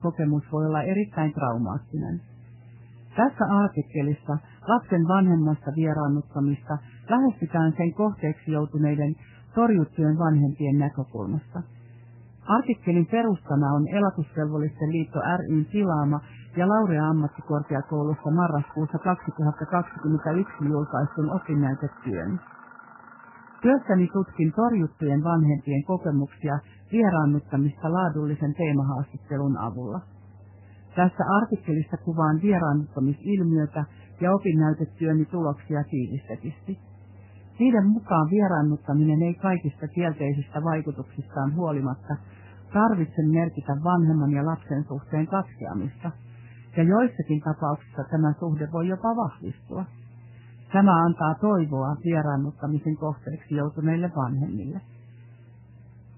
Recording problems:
garbled, watery; badly; nothing above 3 kHz
machinery noise; faint; throughout; 25 dB below the speech

